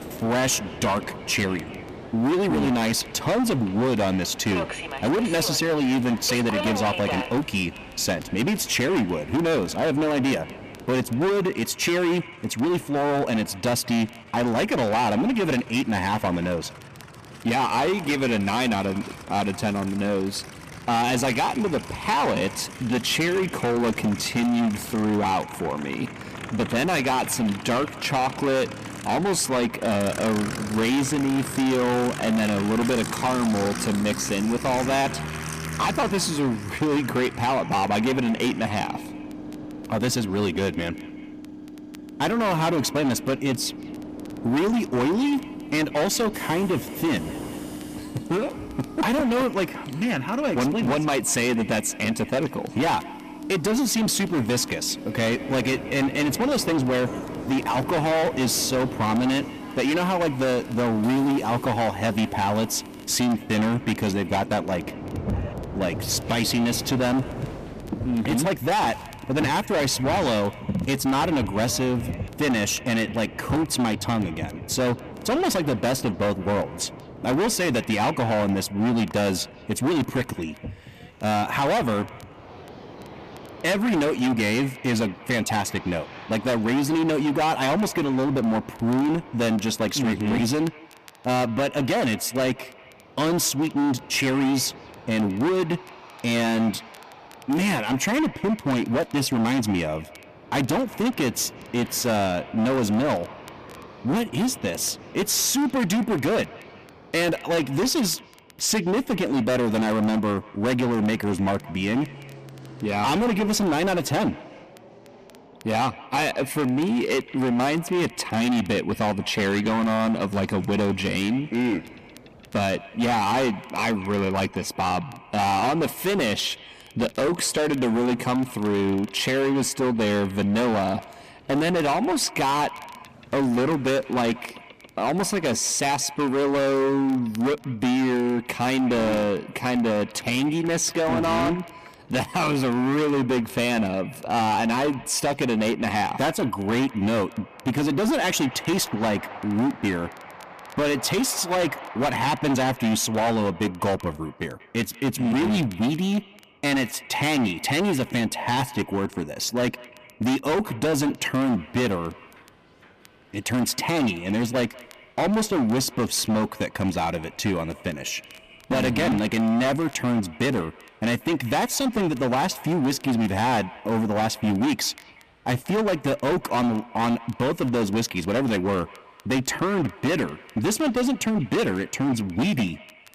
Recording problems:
distortion; heavy; 21% of the sound clipped
echo of what is said; faint; throughout; 190 ms later, 20 dB below the speech
train or aircraft noise; noticeable; throughout; 15 dB below the speech
crackle, like an old record; faint; 30 dB below the speech

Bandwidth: 14.5 kHz